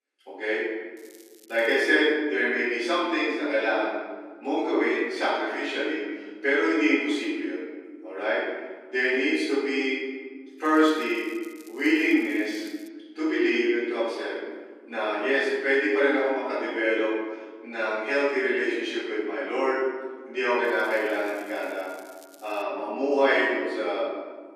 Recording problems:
room echo; strong; dies away in 1.2 s
off-mic speech; far
thin; somewhat; fading below 300 Hz
crackling; faint; 4 times, first at 1 s; 30 dB below the speech

